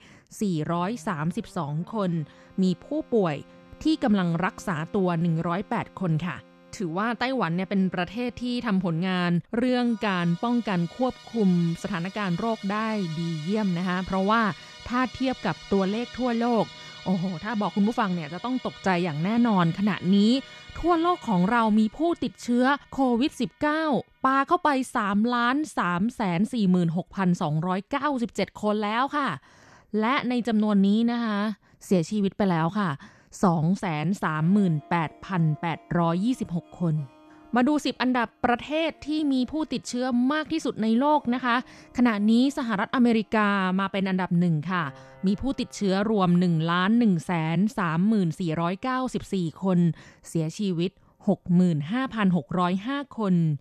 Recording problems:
background music; faint; throughout; 20 dB below the speech

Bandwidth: 13.5 kHz